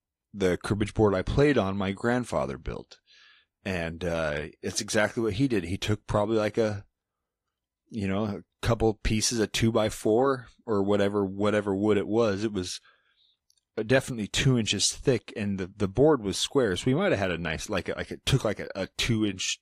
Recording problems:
garbled, watery; slightly

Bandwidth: 15 kHz